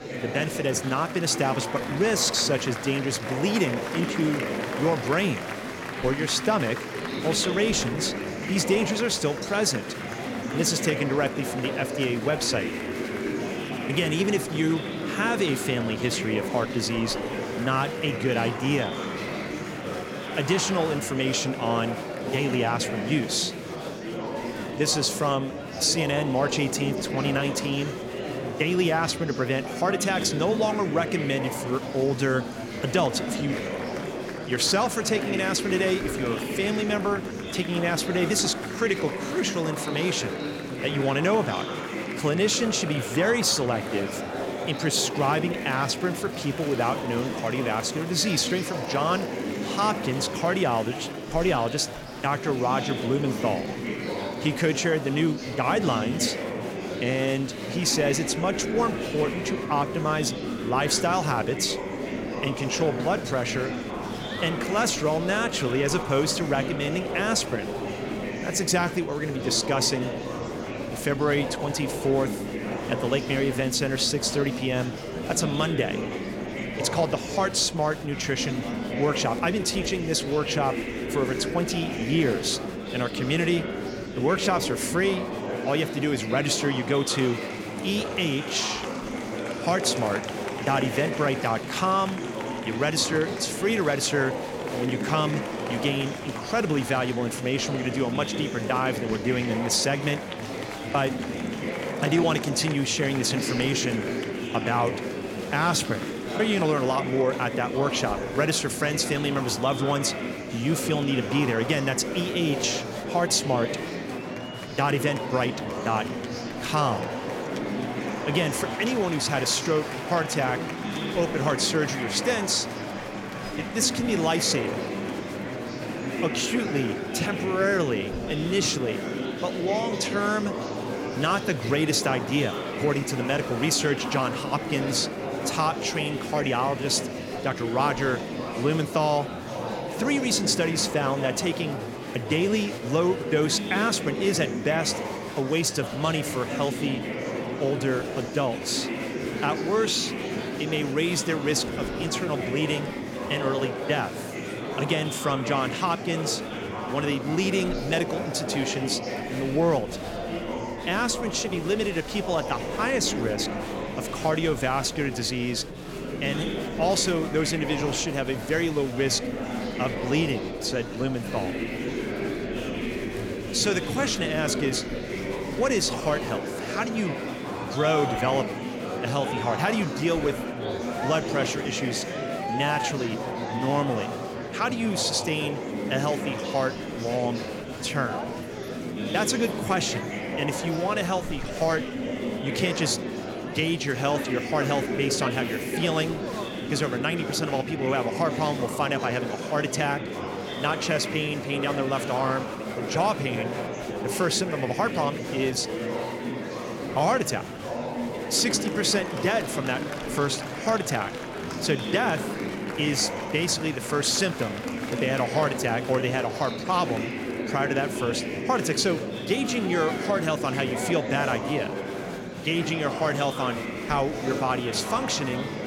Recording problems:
murmuring crowd; loud; throughout; 5 dB below the speech

